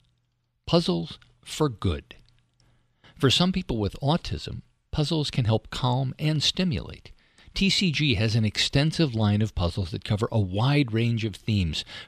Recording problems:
none

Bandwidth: 14 kHz